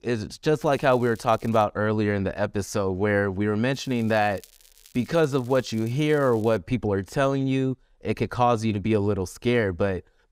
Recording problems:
crackling; faint; from 0.5 to 1.5 s and from 3.5 to 6.5 s; 25 dB below the speech

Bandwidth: 15.5 kHz